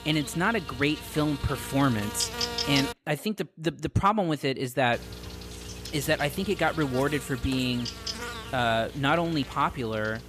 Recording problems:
electrical hum; loud; until 3 s and from 5 s on; 60 Hz, 8 dB below the speech

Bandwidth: 14.5 kHz